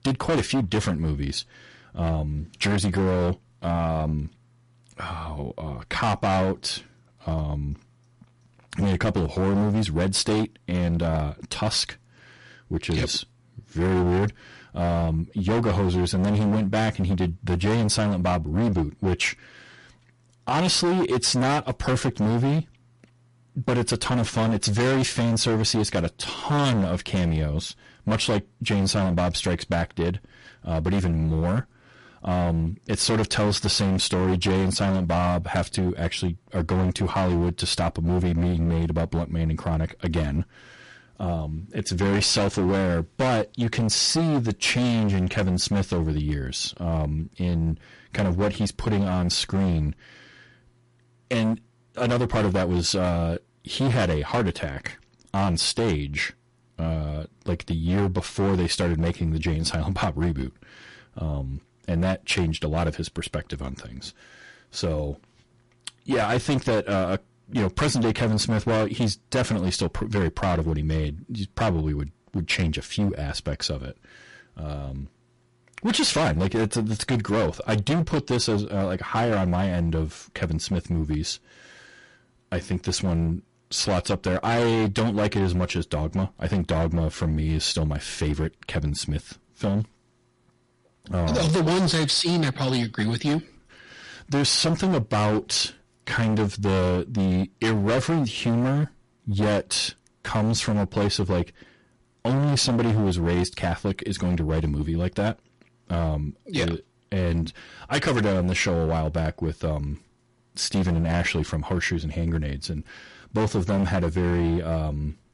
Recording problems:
distortion; heavy; 17% of the sound clipped
garbled, watery; slightly; nothing above 11 kHz

